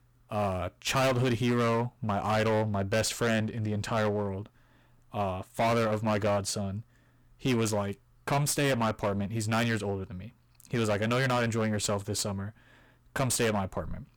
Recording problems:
distortion; heavy; 15% of the sound clipped

